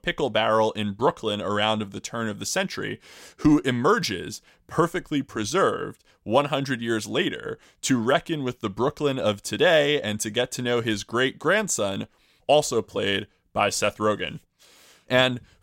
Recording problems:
none

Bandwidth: 16 kHz